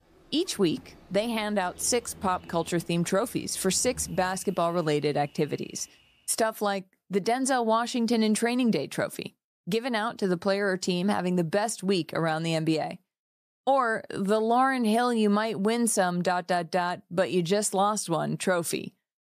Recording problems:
animal sounds; faint; until 6 s; 25 dB below the speech

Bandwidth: 14.5 kHz